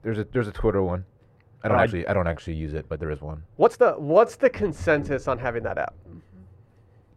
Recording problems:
muffled; very; fading above 2.5 kHz
uneven, jittery; strongly; from 0.5 to 6 s

